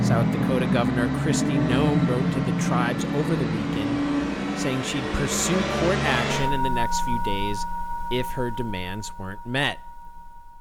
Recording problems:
background music; very loud; throughout; 2 dB above the speech

